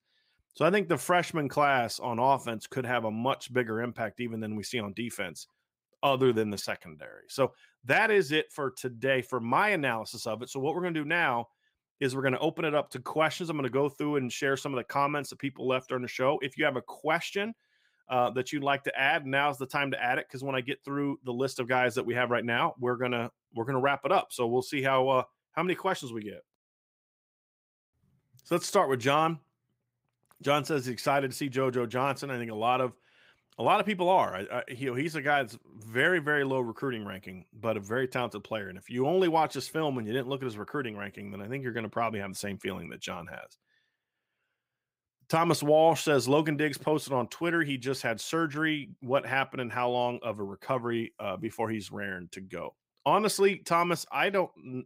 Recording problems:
none

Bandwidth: 15.5 kHz